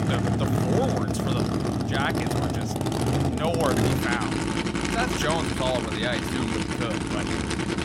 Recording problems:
traffic noise; very loud; throughout; 4 dB above the speech

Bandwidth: 16.5 kHz